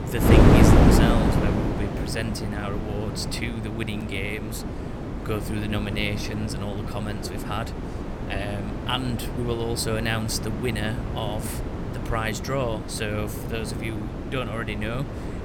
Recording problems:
wind noise on the microphone; heavy; as loud as the speech

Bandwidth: 17 kHz